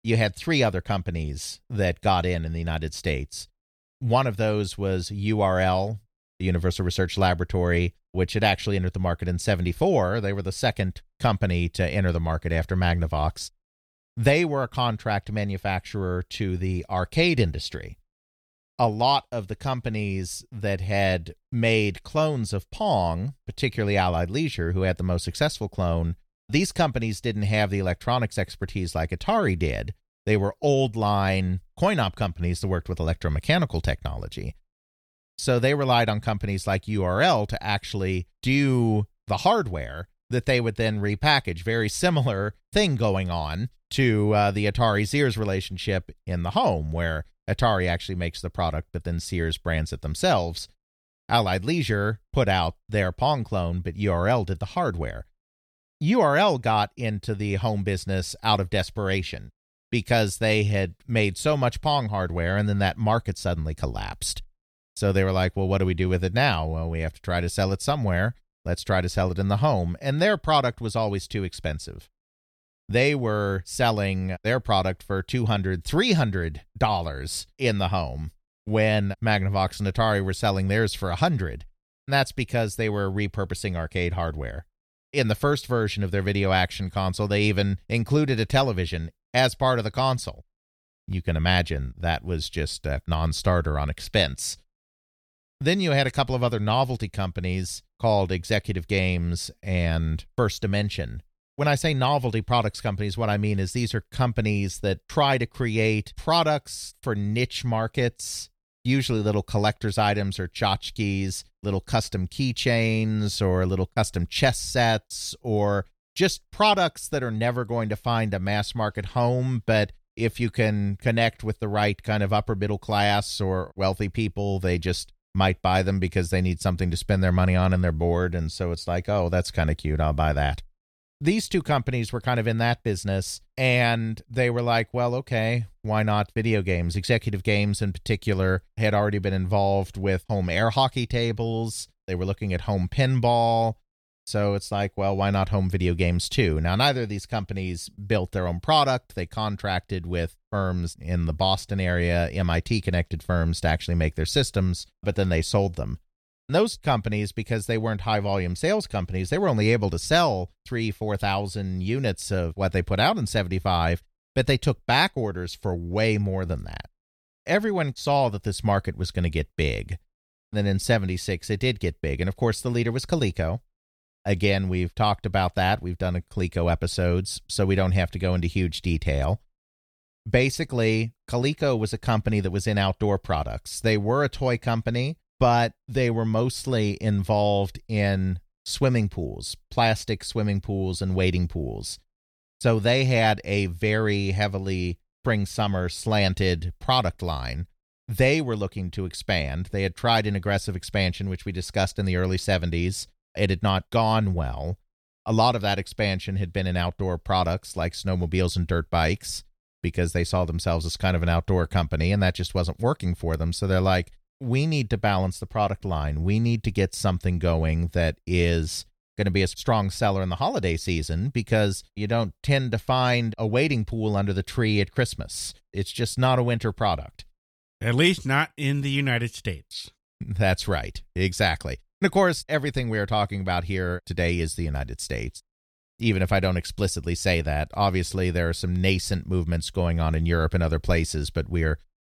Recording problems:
none

